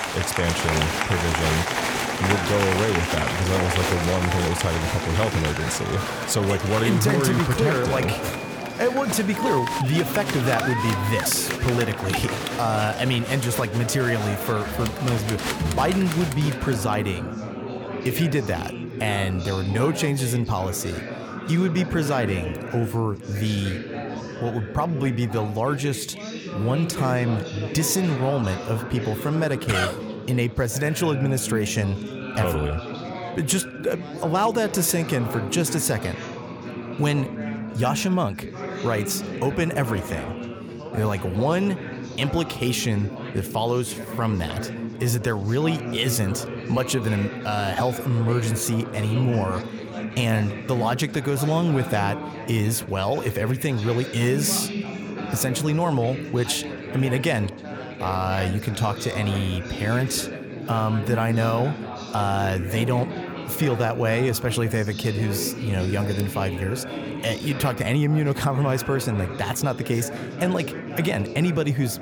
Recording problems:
chatter from many people; loud; throughout; 6 dB below the speech

